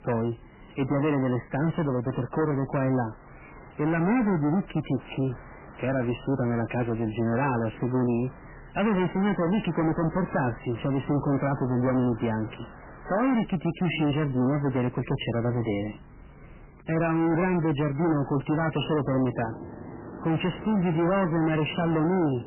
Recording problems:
distortion; heavy; 21% of the sound clipped
garbled, watery; badly; nothing above 3 kHz
train or aircraft noise; noticeable; throughout; 20 dB below the speech

